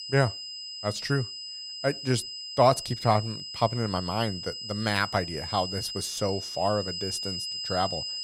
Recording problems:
high-pitched whine; loud; throughout; 5 kHz, 6 dB below the speech

